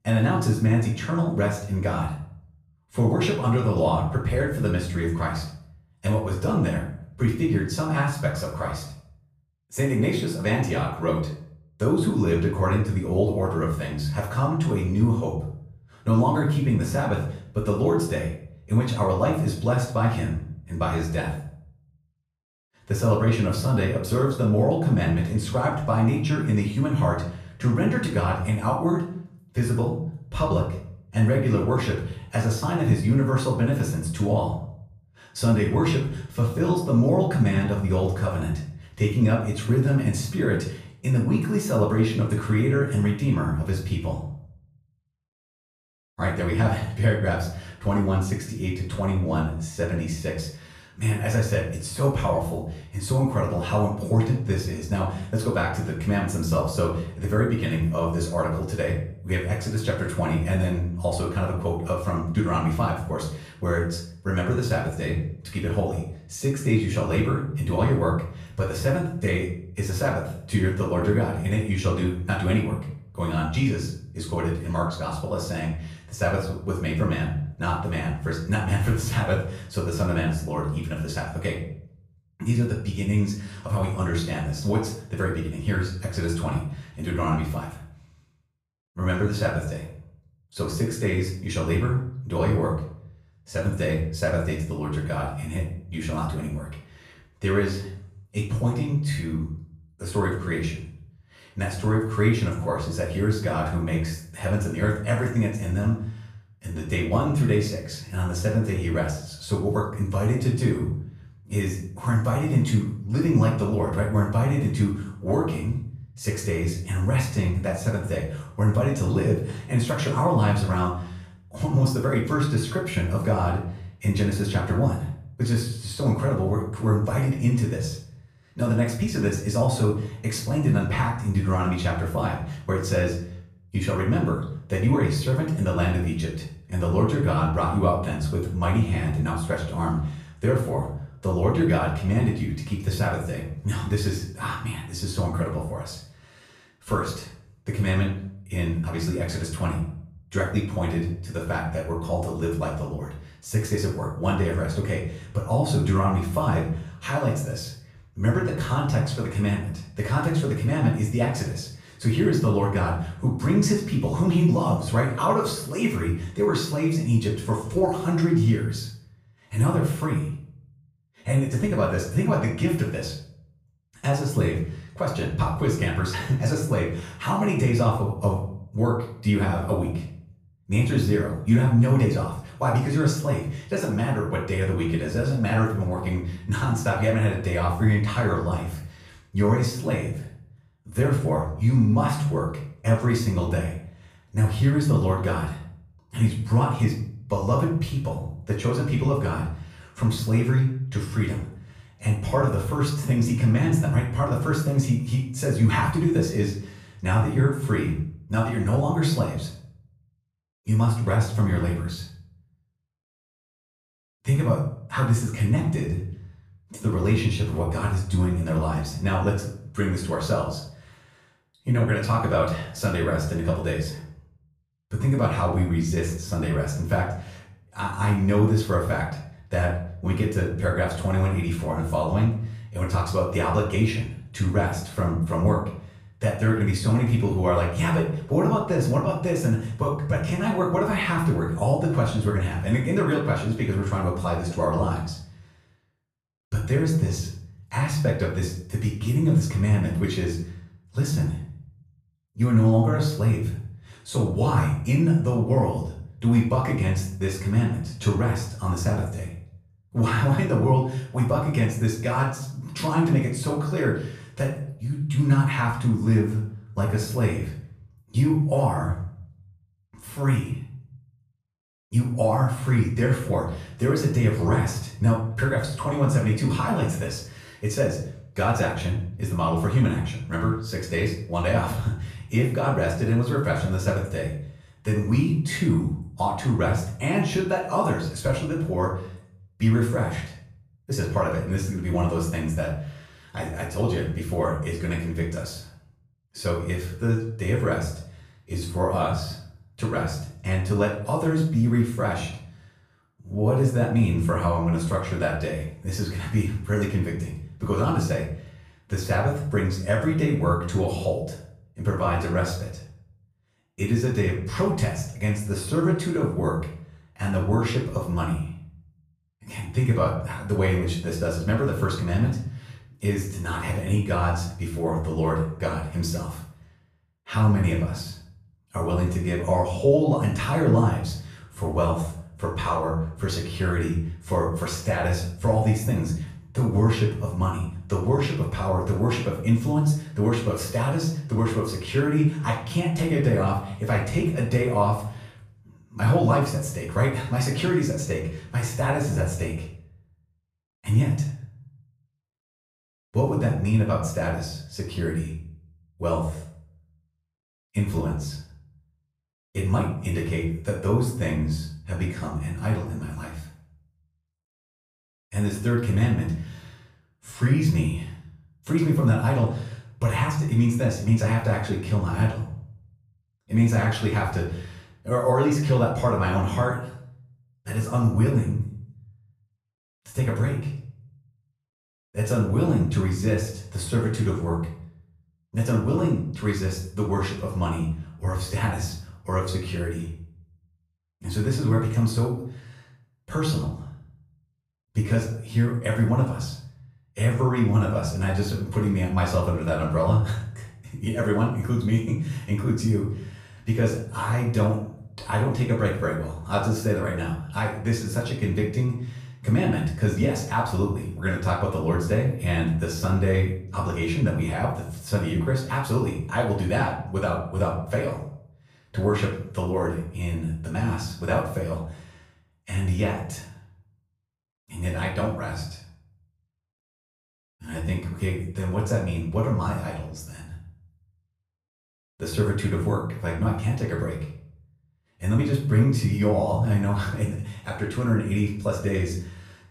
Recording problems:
off-mic speech; far
room echo; noticeable; dies away in 0.5 s

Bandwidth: 14.5 kHz